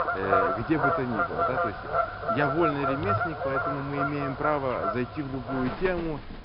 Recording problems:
high frequencies cut off; noticeable; nothing above 5.5 kHz
animal sounds; very loud; throughout; 2 dB above the speech

